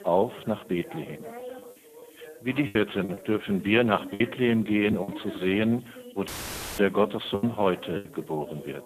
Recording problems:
phone-call audio; poor line
background chatter; noticeable; throughout; 2 voices, 15 dB below the speech
hiss; faint; throughout; 30 dB below the speech
choppy; very; 6% of the speech affected
audio cutting out; filled with static; at 6.5 s for 0.5 s

